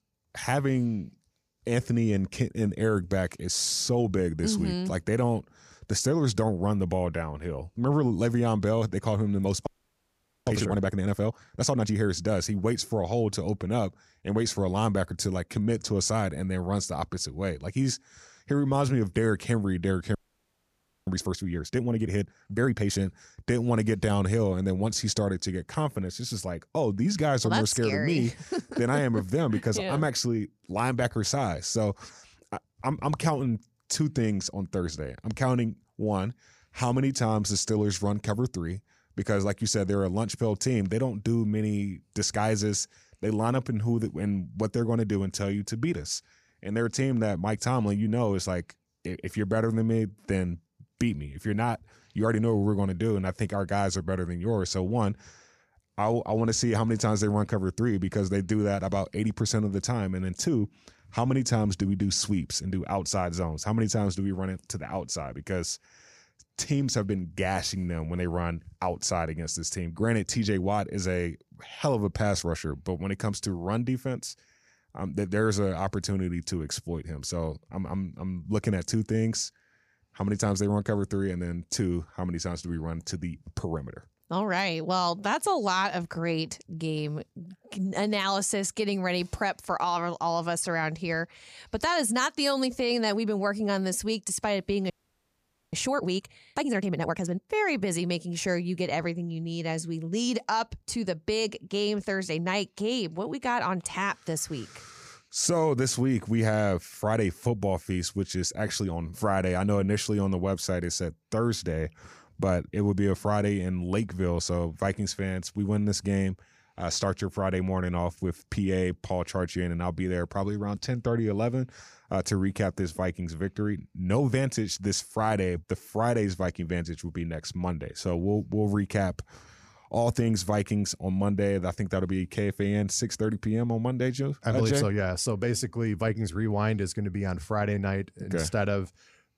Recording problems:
audio freezing; at 9.5 s for 1 s, at 20 s for 1 s and at 1:35 for 1 s

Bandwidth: 15 kHz